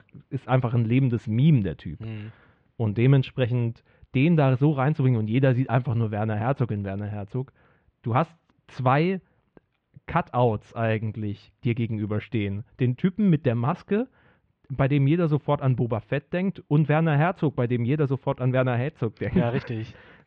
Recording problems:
muffled; very; fading above 3 kHz

